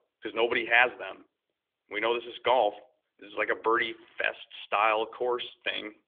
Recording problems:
thin; very; fading below 350 Hz
phone-call audio; nothing above 3.5 kHz

